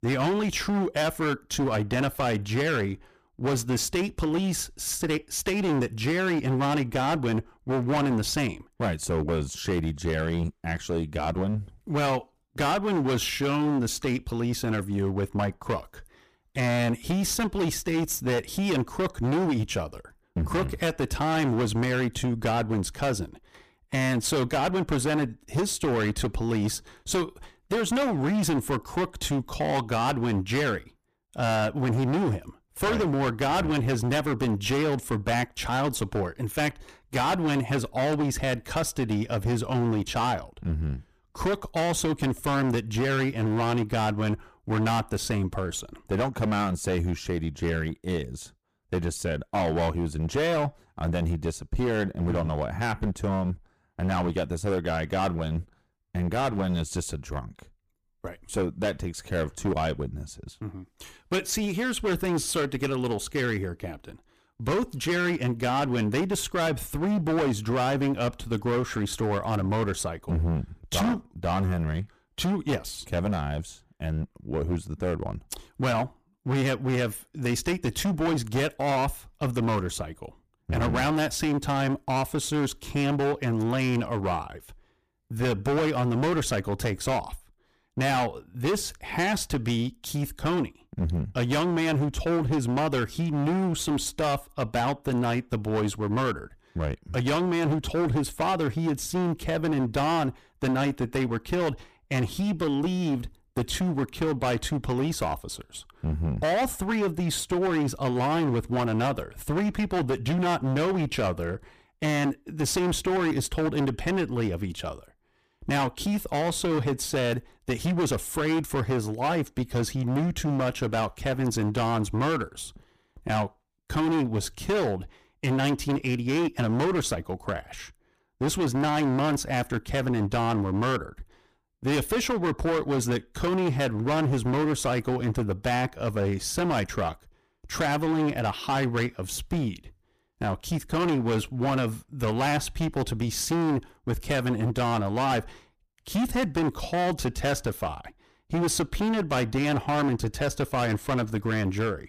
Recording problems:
distortion; heavy; 19% of the sound clipped

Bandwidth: 15 kHz